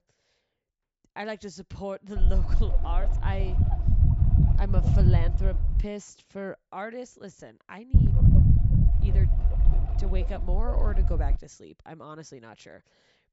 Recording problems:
high frequencies cut off; noticeable; nothing above 8 kHz
low rumble; loud; from 2 to 6 s and from 8 to 11 s; as loud as the speech

